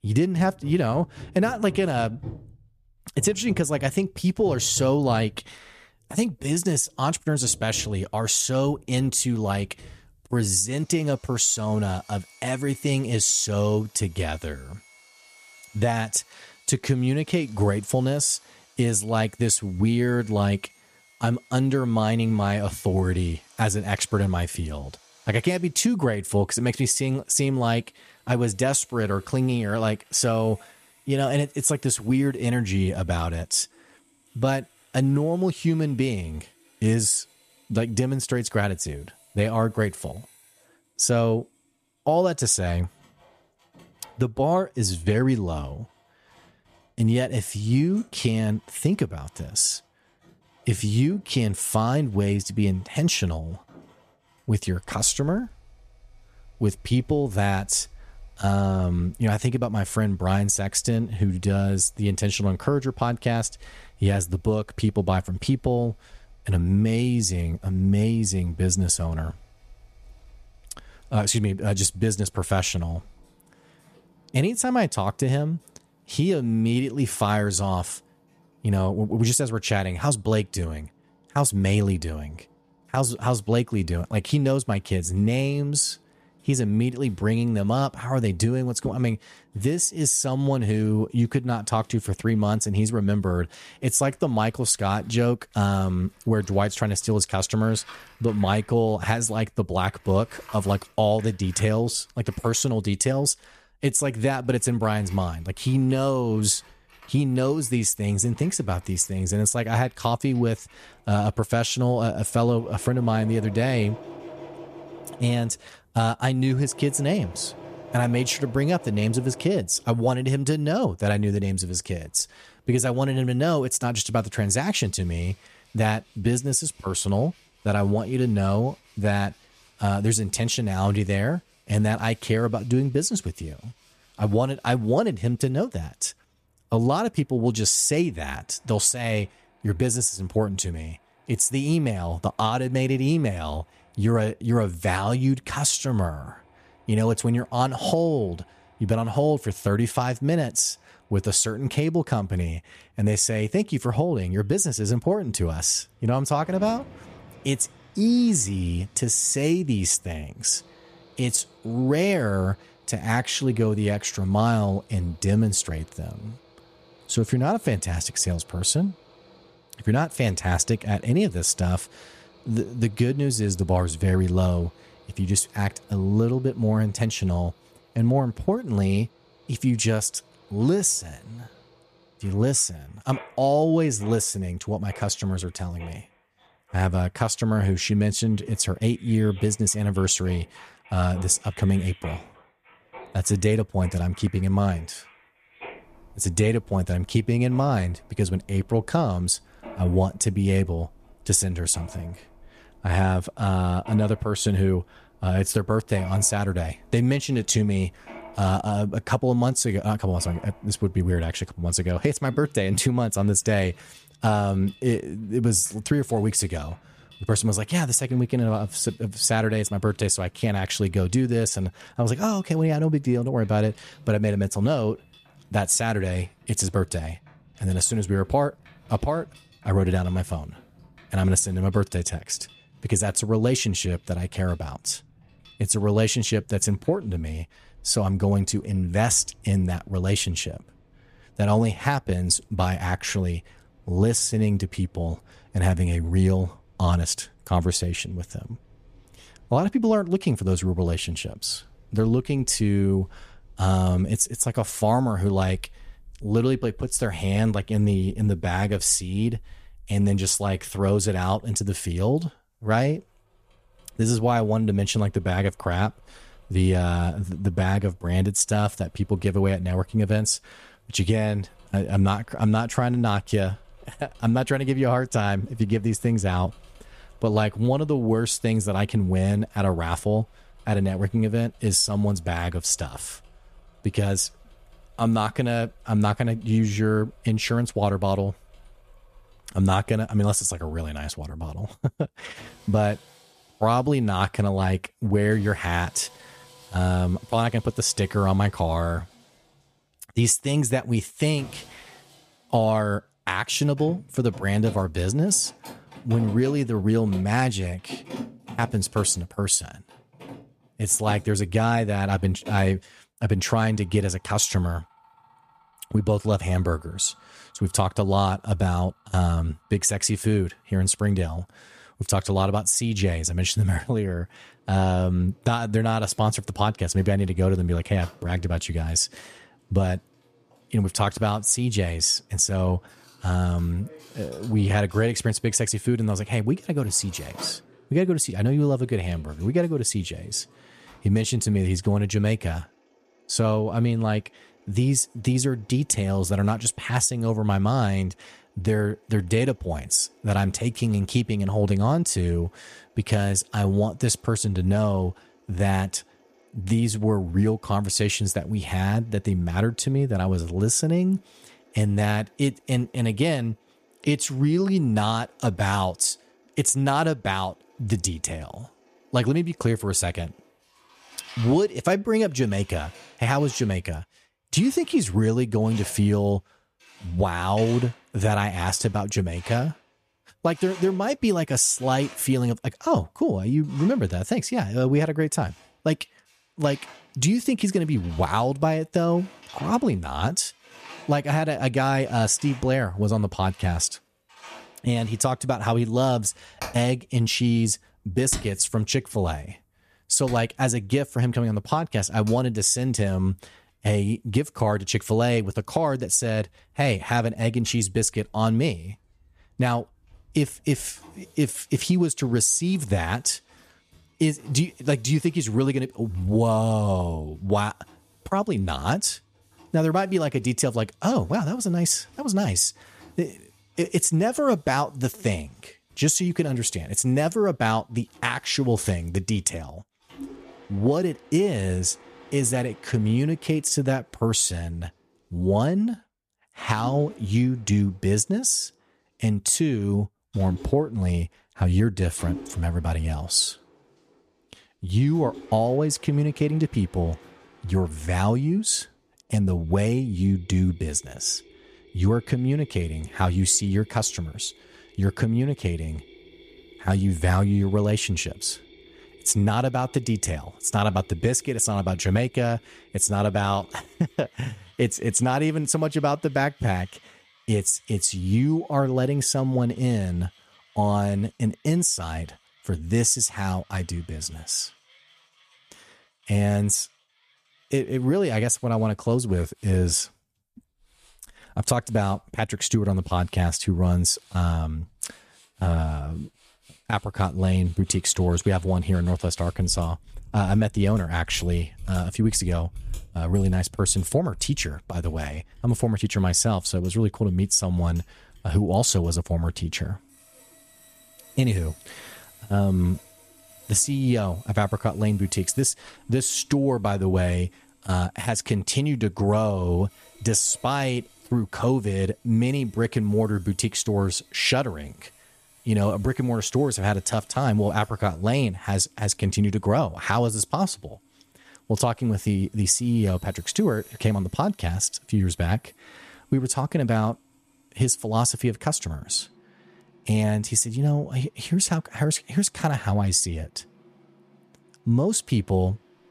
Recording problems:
machinery noise; faint; throughout; 25 dB below the speech

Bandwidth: 14.5 kHz